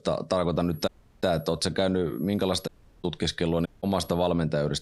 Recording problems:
squashed, flat; somewhat
high-pitched whine; faint; at 0.5 s, at 2 s and at 3.5 s; 11.5 kHz, 30 dB below the speech
audio cutting out; at 1 s, at 2.5 s and at 3.5 s

